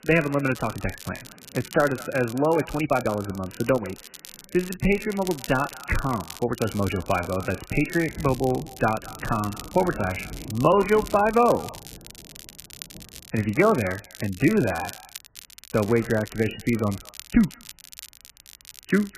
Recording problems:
garbled, watery; badly; nothing above 3 kHz
echo of what is said; faint; throughout; 210 ms later, 25 dB below the speech
crackle, like an old record; noticeable; 15 dB below the speech
rain or running water; faint; throughout; 20 dB below the speech
uneven, jittery; strongly; from 0.5 to 18 s

